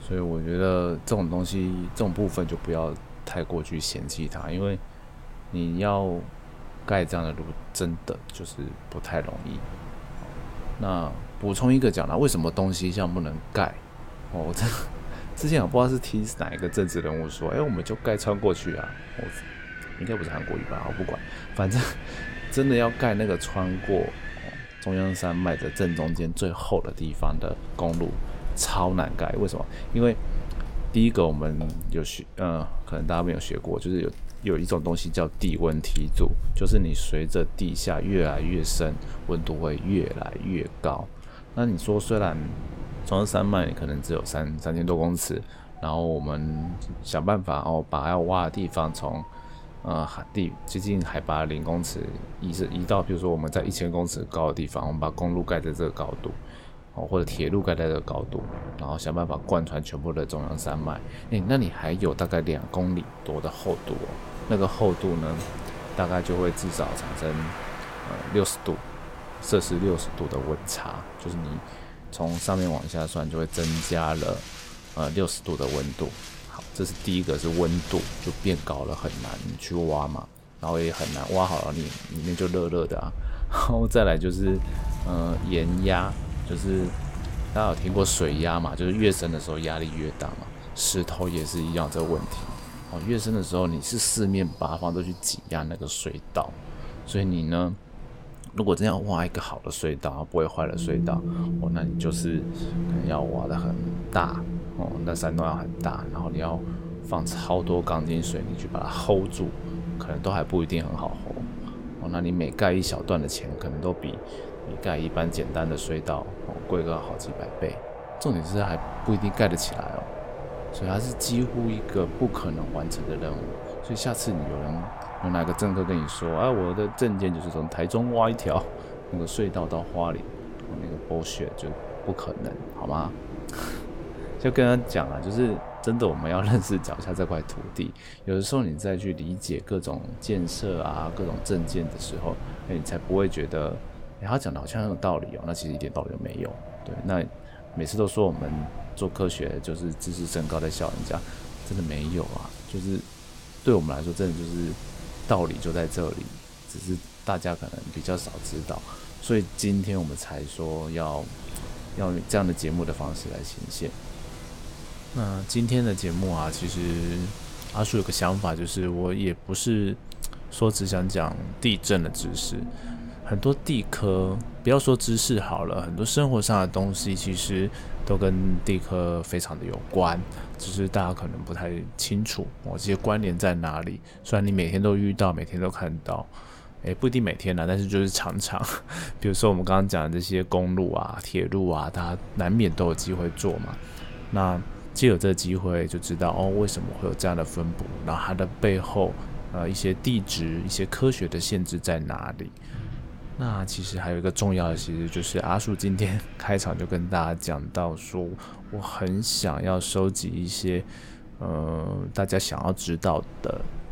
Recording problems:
wind in the background; noticeable; throughout; 10 dB below the speech

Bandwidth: 16.5 kHz